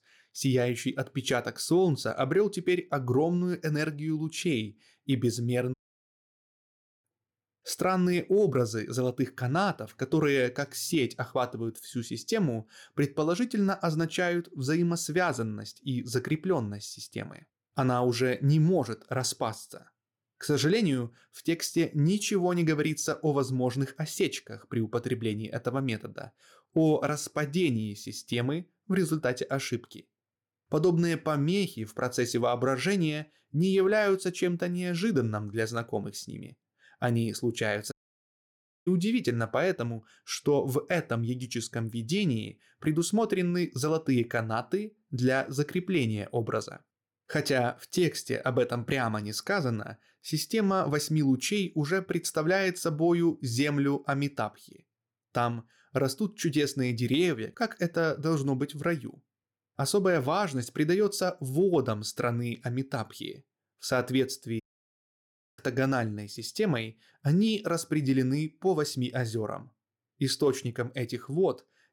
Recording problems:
audio cutting out; at 5.5 s for 1.5 s, at 38 s for 1 s and at 1:05 for 1 s

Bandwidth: 17.5 kHz